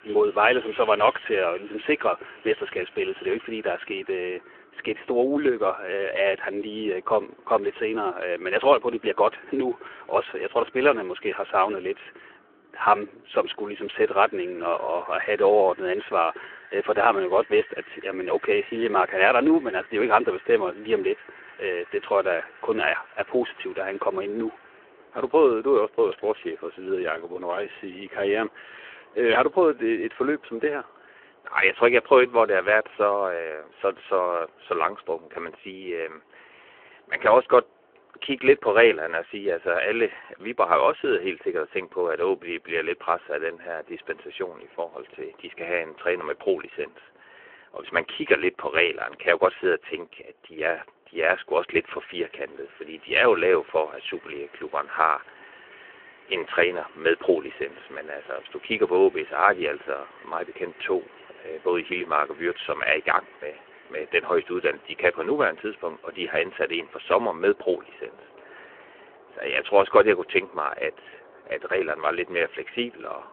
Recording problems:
phone-call audio
wind in the background; faint; throughout; 25 dB below the speech

